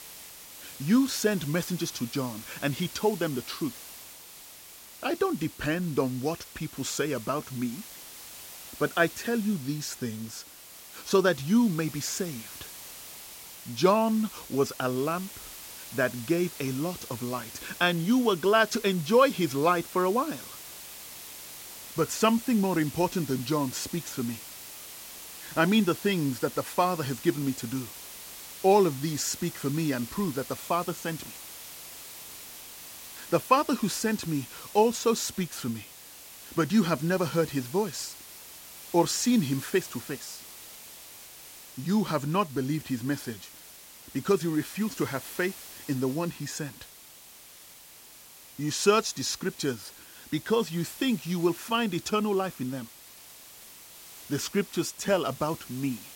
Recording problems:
hiss; noticeable; throughout; 15 dB below the speech

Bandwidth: 16.5 kHz